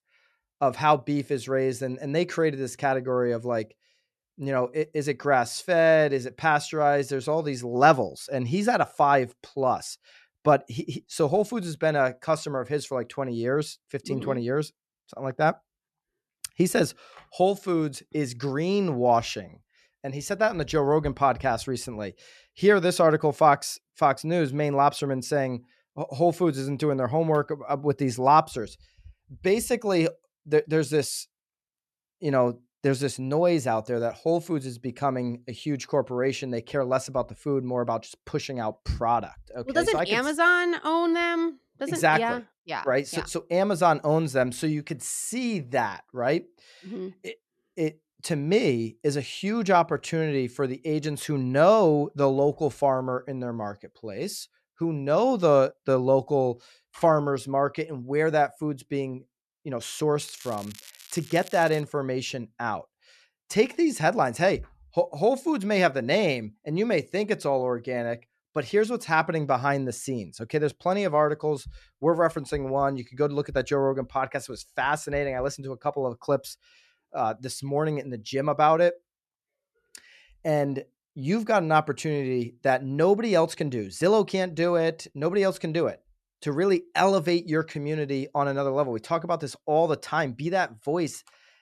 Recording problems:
crackling; noticeable; from 1:00 to 1:02; 20 dB below the speech

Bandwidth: 13.5 kHz